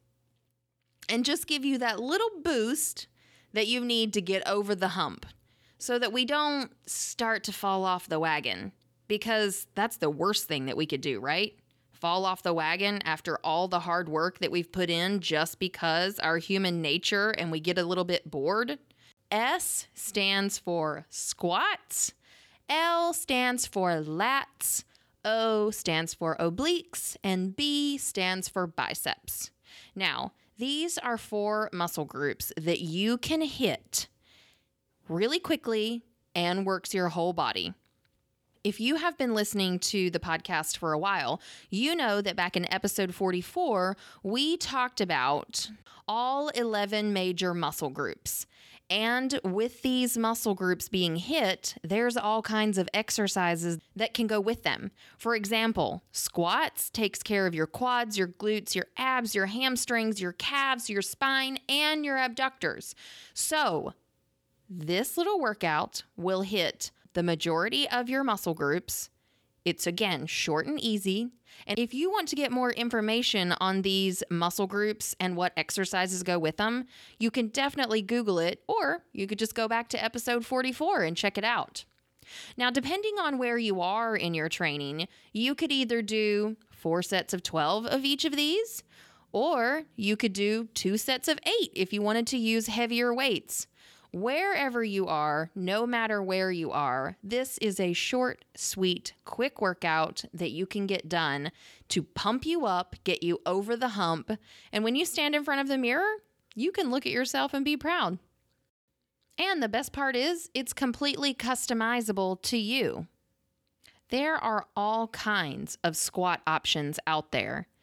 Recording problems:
none

